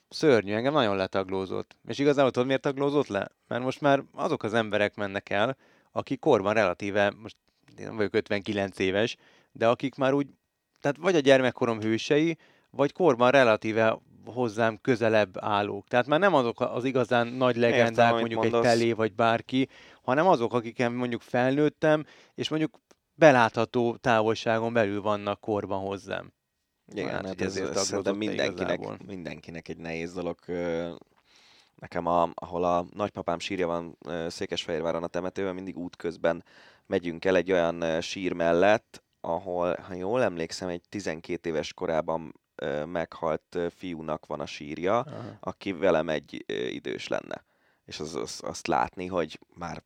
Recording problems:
none

